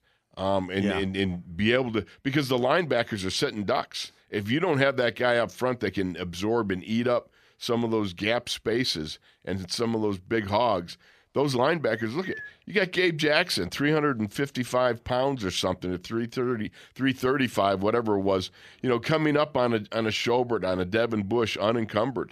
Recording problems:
none

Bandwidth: 14.5 kHz